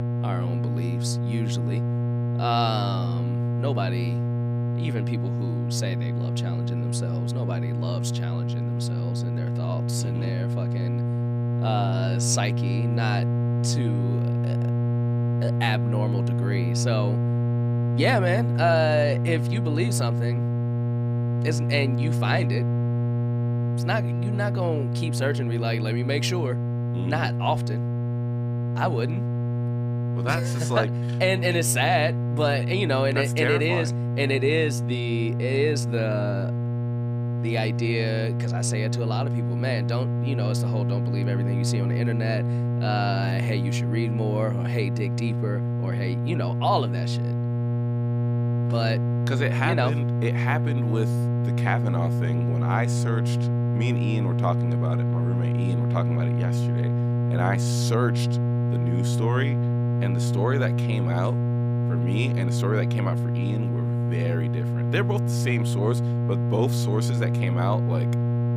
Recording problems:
electrical hum; loud; throughout; 60 Hz, 6 dB below the speech

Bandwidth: 15 kHz